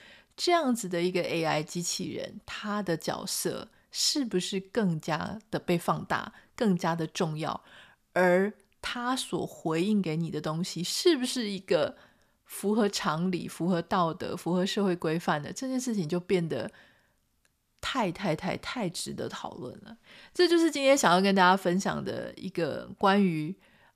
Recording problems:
none

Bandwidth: 14.5 kHz